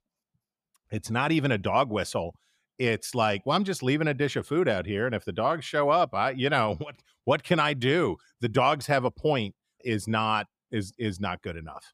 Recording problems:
none

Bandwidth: 15.5 kHz